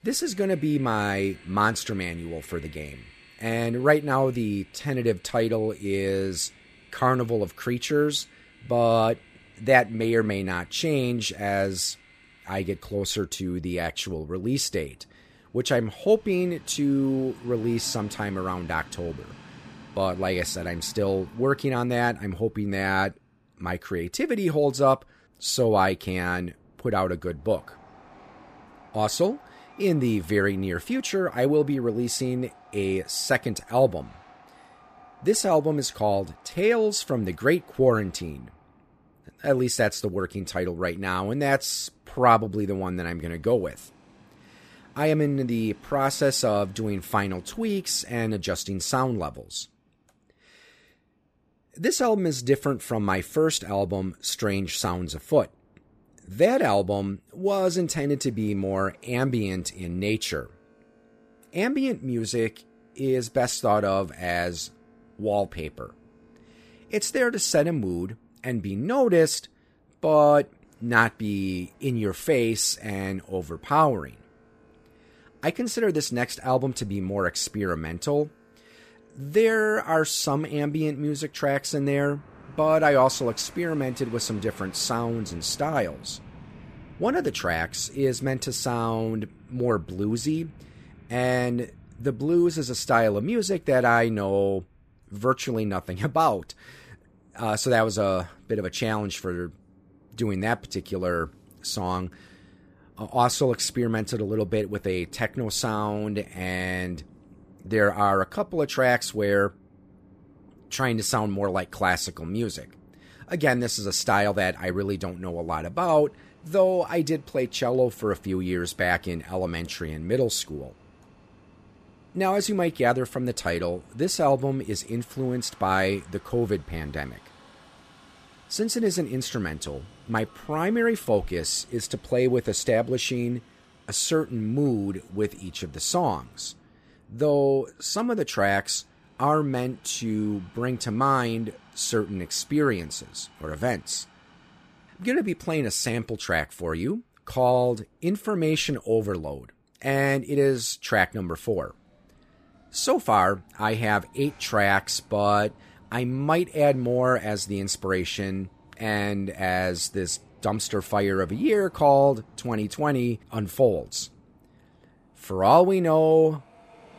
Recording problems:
train or aircraft noise; faint; throughout; 25 dB below the speech

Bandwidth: 14.5 kHz